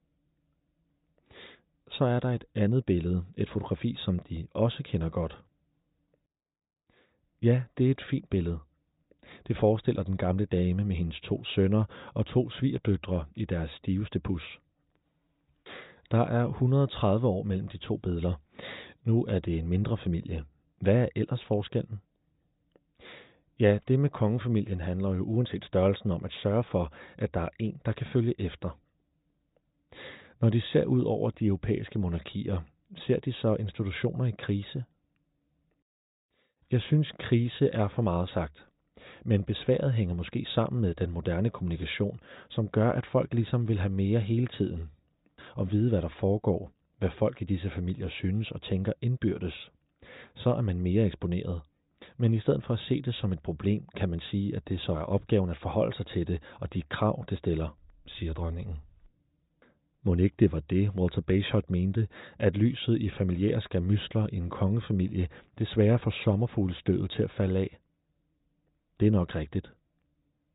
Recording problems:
high frequencies cut off; severe; nothing above 4 kHz

